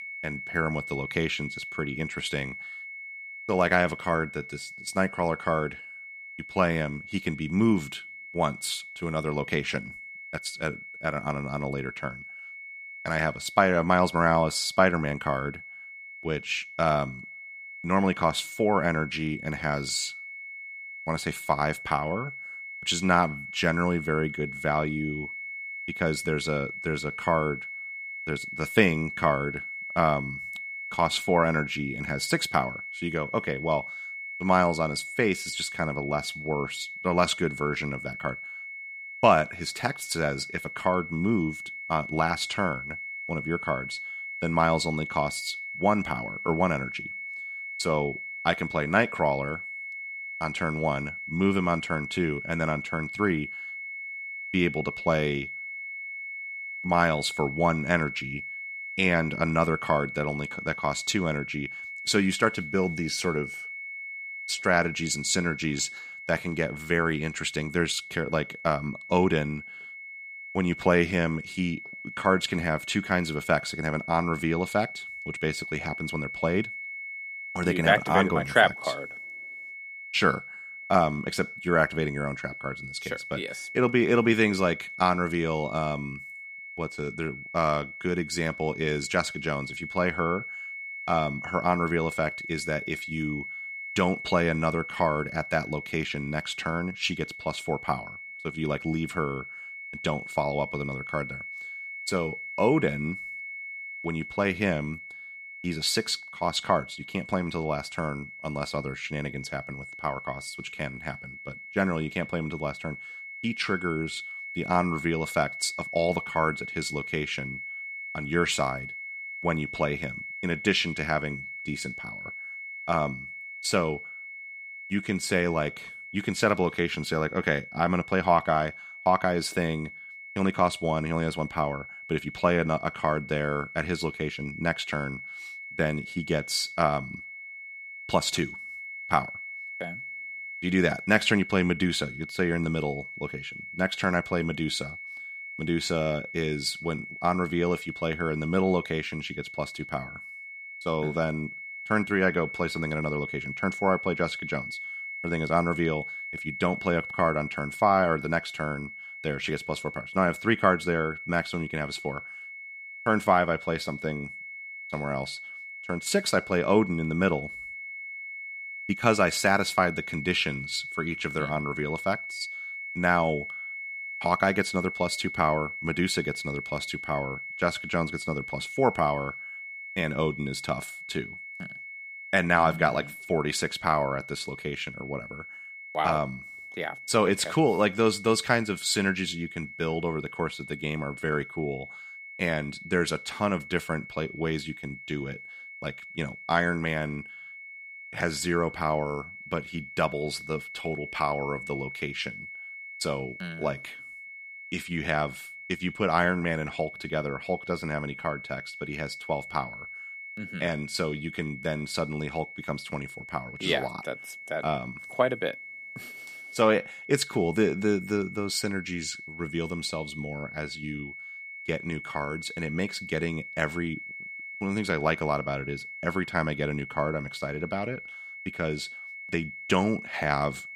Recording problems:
high-pitched whine; loud; throughout; 2 kHz, 9 dB below the speech

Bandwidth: 14.5 kHz